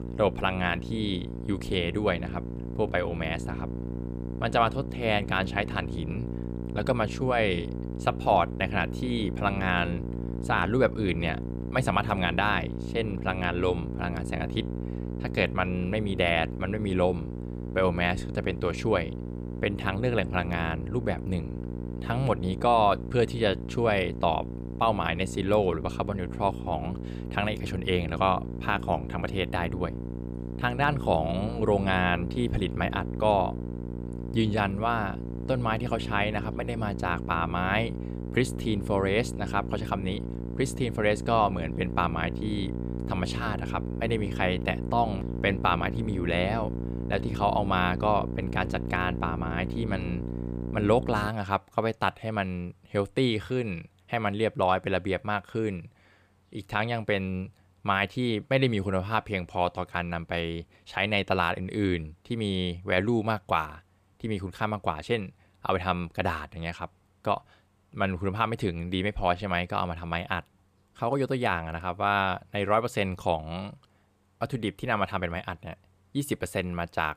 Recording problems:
electrical hum; noticeable; until 51 s; 60 Hz, 15 dB below the speech

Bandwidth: 14.5 kHz